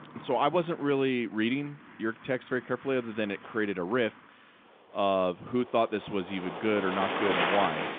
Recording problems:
phone-call audio
traffic noise; loud; throughout; 1 dB below the speech

